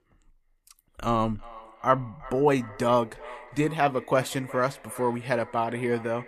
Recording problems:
echo of what is said; faint; throughout; 360 ms later, 20 dB below the speech

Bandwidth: 14.5 kHz